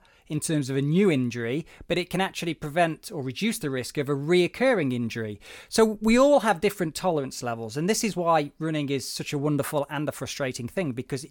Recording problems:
none

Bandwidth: 17.5 kHz